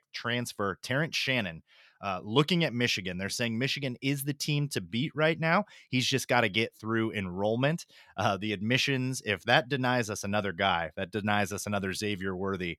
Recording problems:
none

